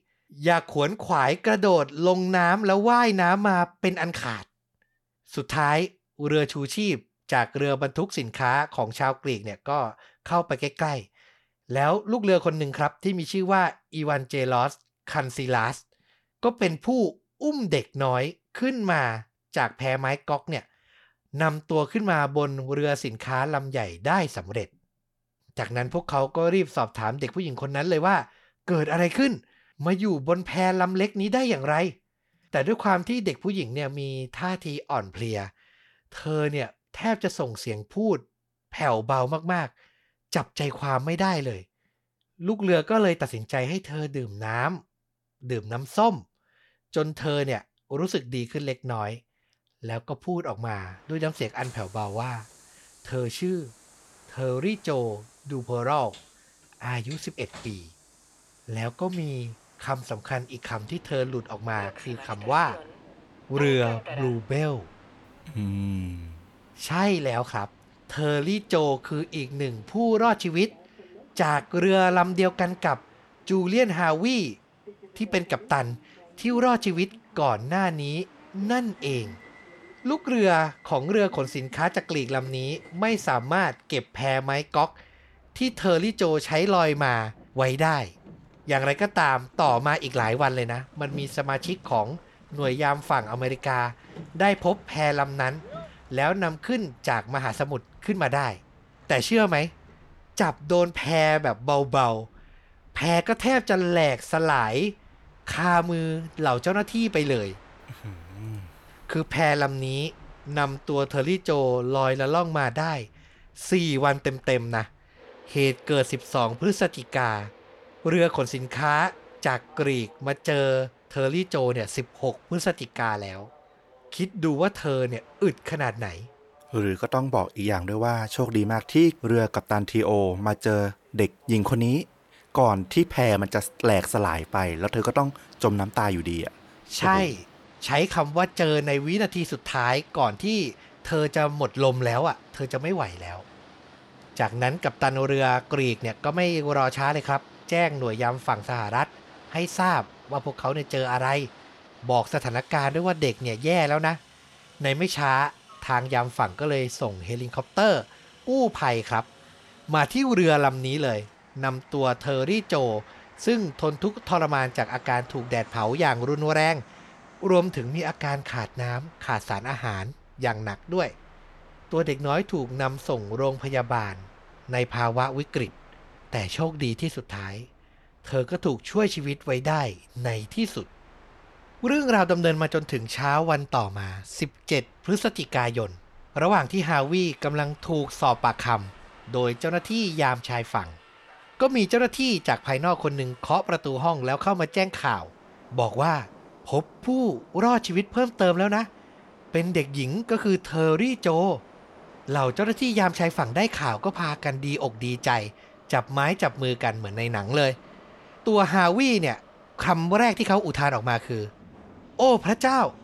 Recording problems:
train or aircraft noise; faint; from 51 s on; 25 dB below the speech

